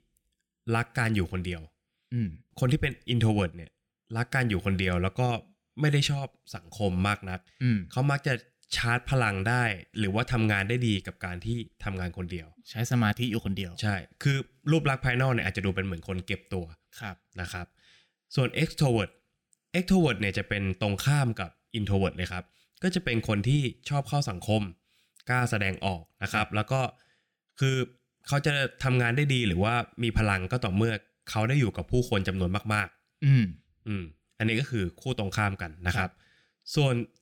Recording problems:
none

